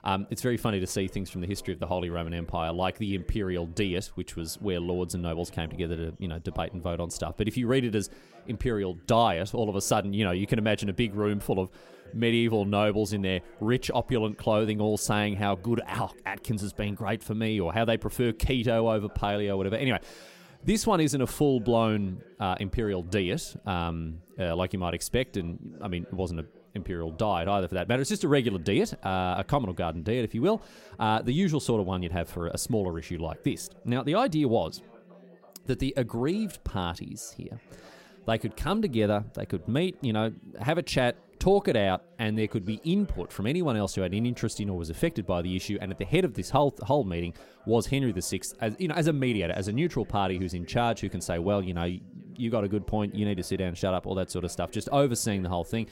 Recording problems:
background chatter; faint; throughout; 4 voices, 25 dB below the speech

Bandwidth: 16 kHz